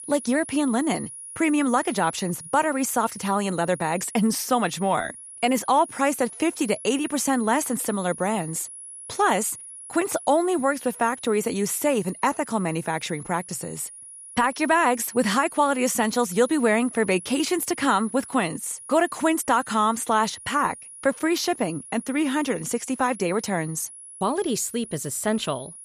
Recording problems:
high-pitched whine; noticeable; throughout; 10.5 kHz, 15 dB below the speech

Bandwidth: 14.5 kHz